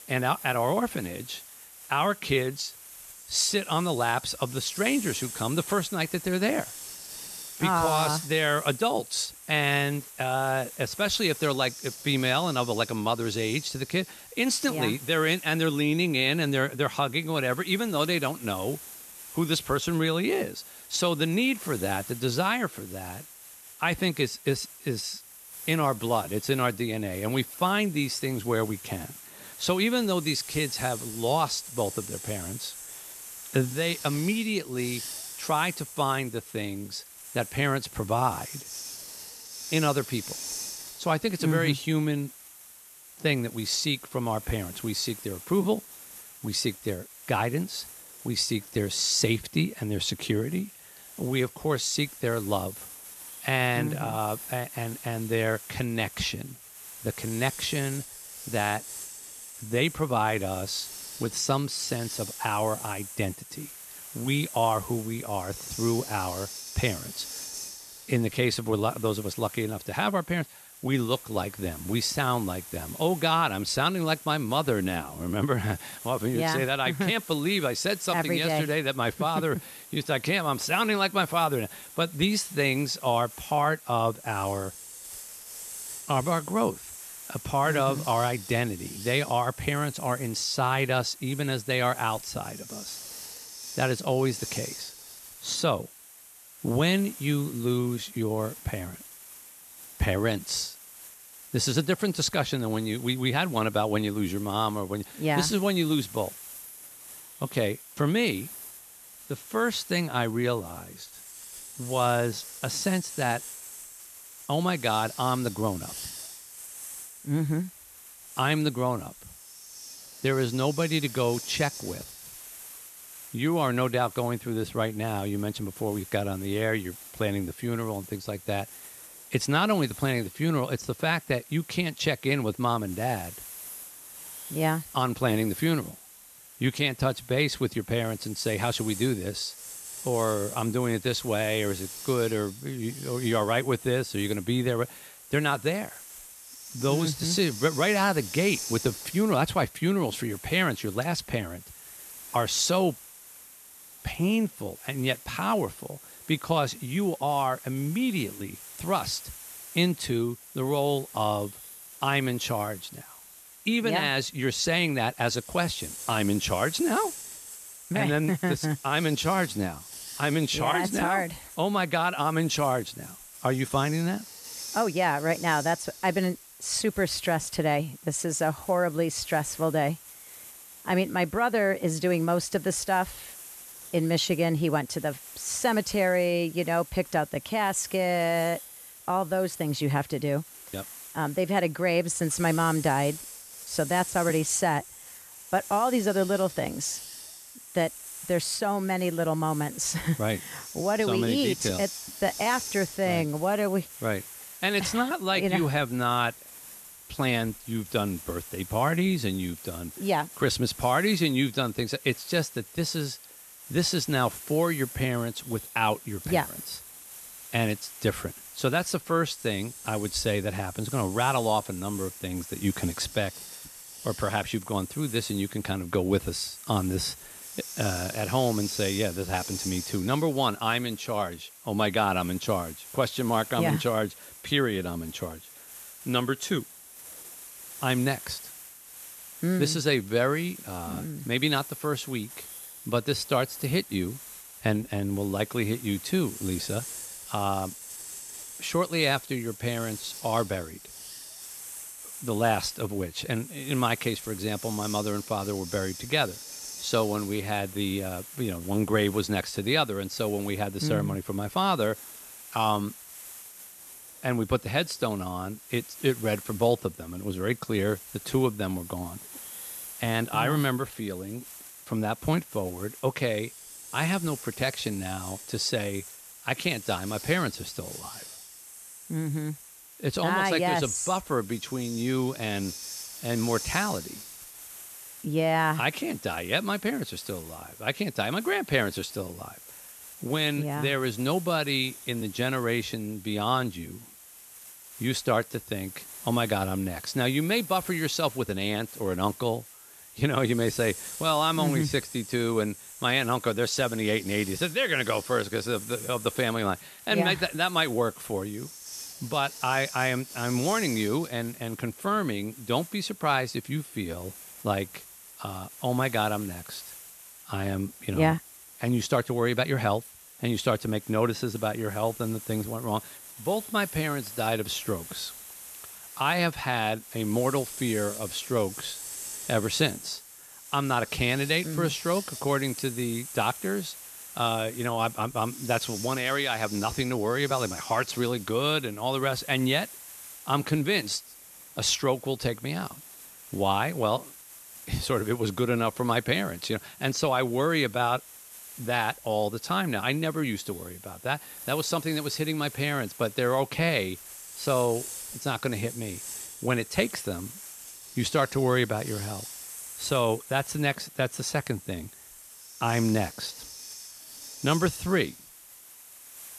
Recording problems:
hiss; noticeable; throughout; 15 dB below the speech

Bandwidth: 13.5 kHz